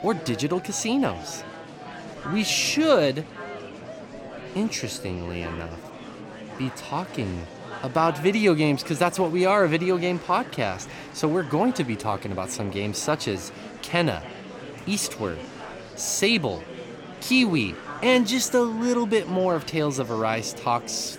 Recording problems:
murmuring crowd; noticeable; throughout; 15 dB below the speech

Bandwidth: 17.5 kHz